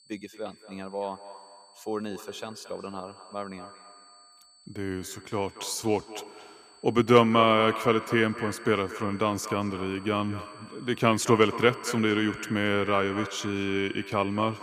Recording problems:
echo of what is said; noticeable; throughout; 230 ms later, 15 dB below the speech
high-pitched whine; faint; throughout; 4.5 kHz, 25 dB below the speech

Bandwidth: 15 kHz